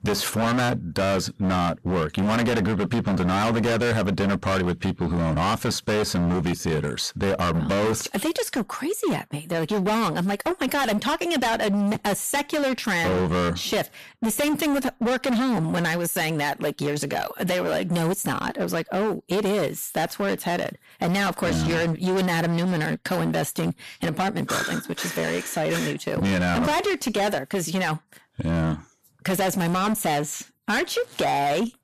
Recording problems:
distortion; heavy; 26% of the sound clipped

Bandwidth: 14.5 kHz